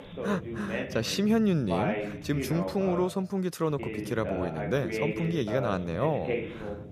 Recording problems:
voice in the background; loud; throughout; 5 dB below the speech

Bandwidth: 14.5 kHz